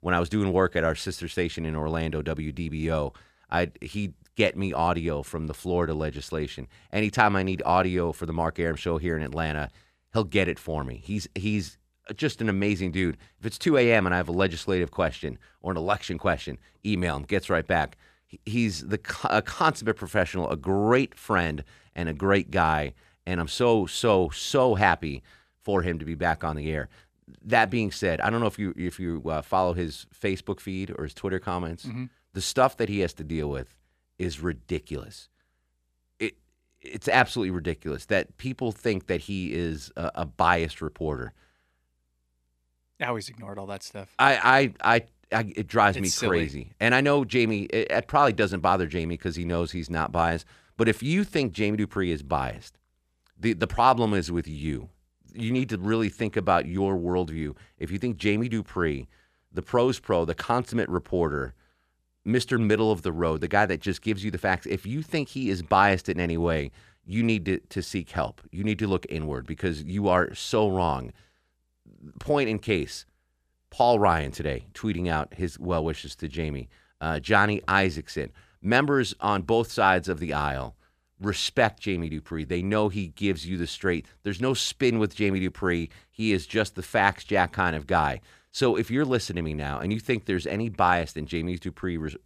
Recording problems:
none

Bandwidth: 14.5 kHz